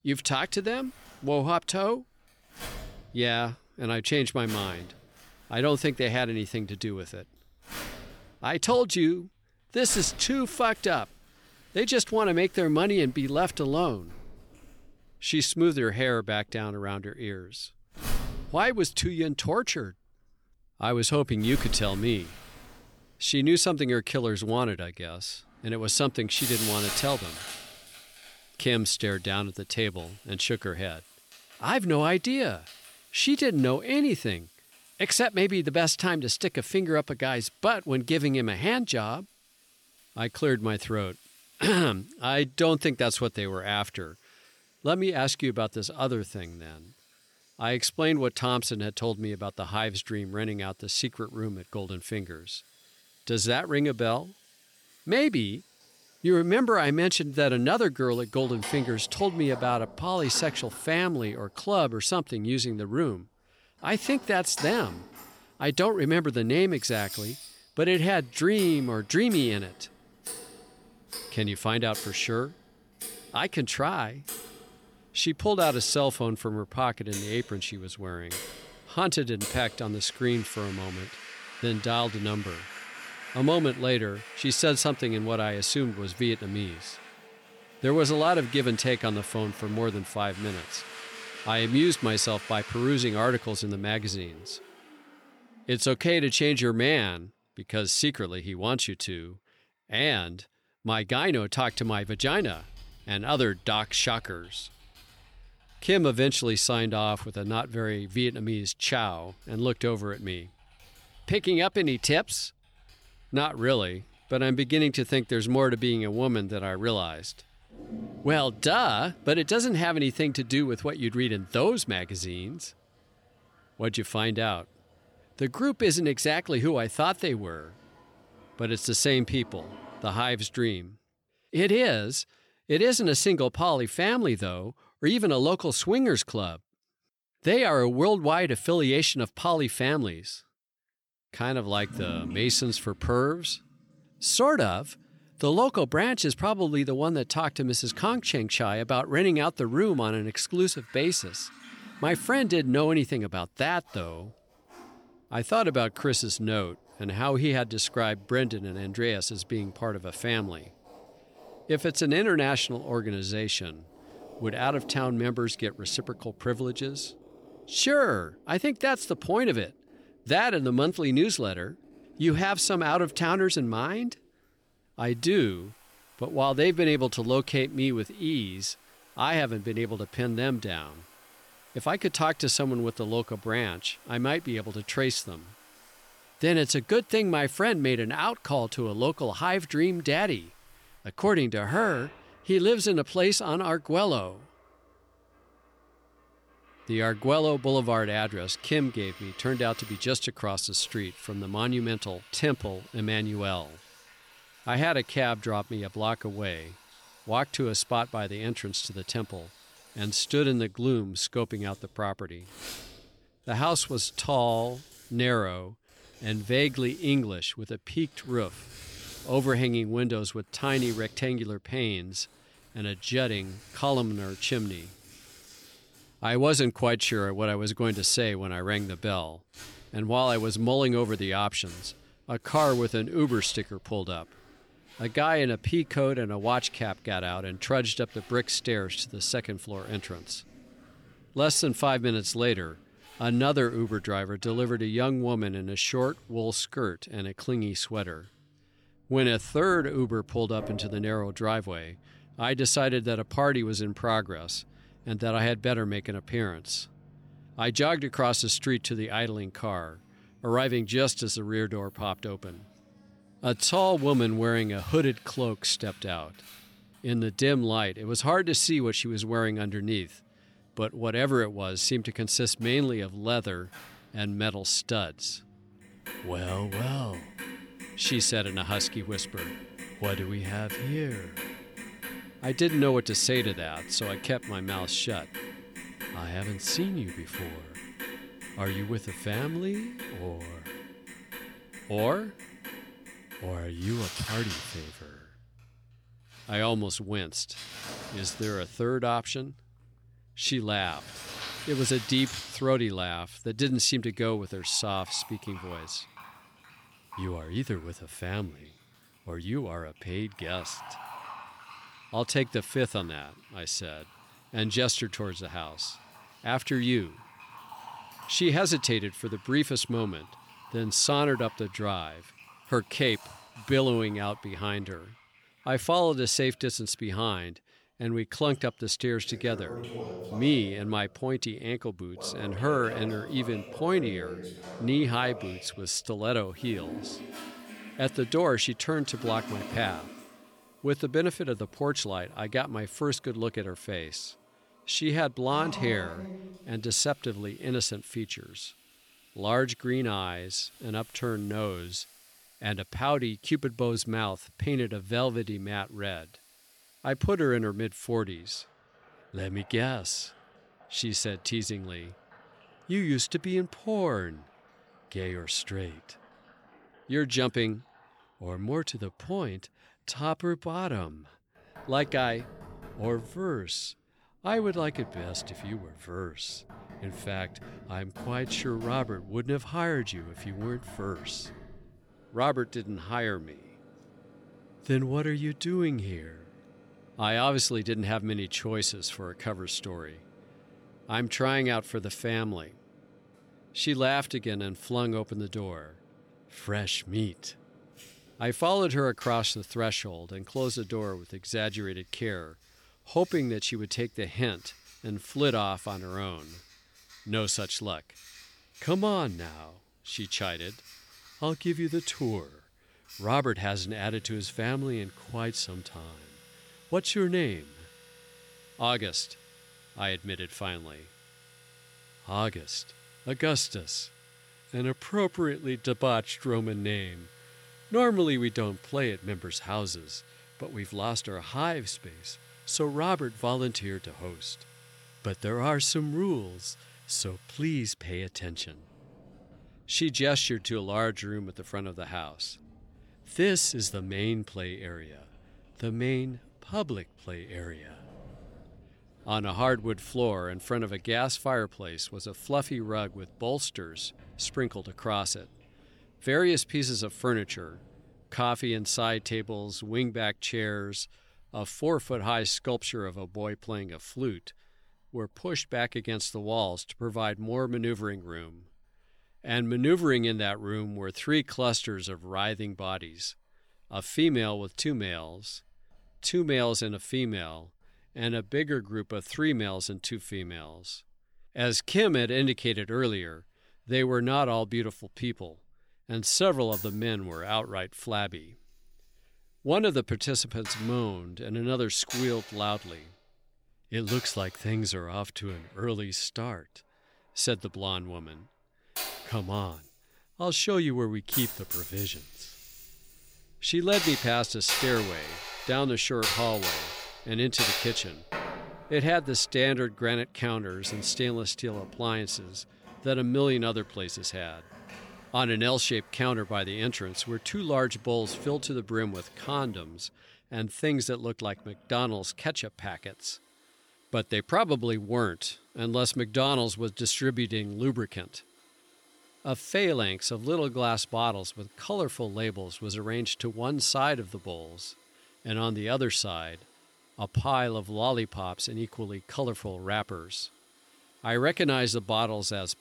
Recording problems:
household noises; noticeable; throughout; 15 dB below the speech

